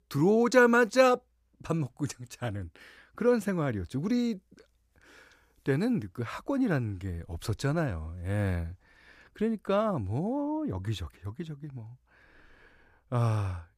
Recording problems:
none

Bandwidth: 14.5 kHz